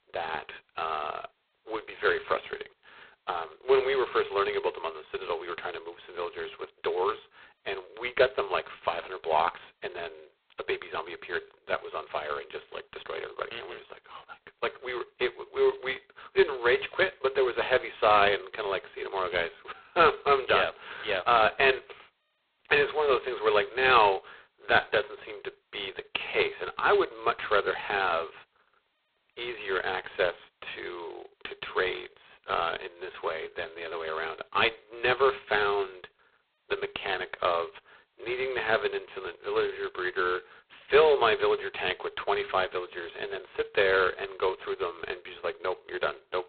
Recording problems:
phone-call audio; poor line; nothing above 4 kHz

